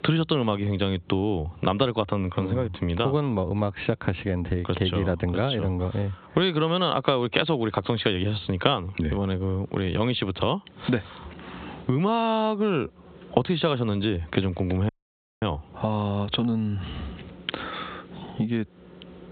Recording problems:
high frequencies cut off; severe; nothing above 4 kHz
squashed, flat; heavily
audio cutting out; at 15 s for 0.5 s

